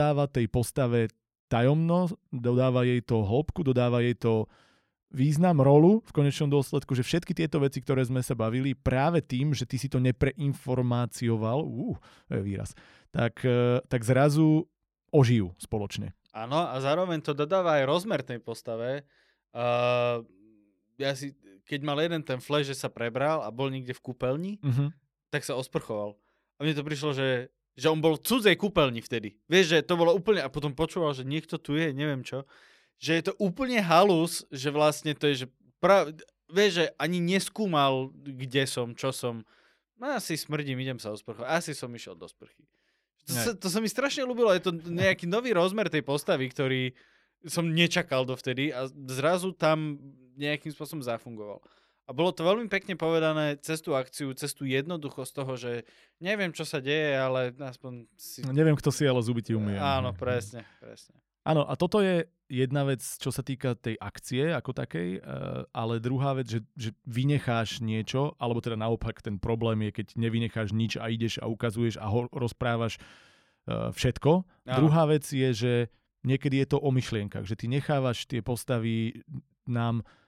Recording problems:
abrupt cut into speech; at the start

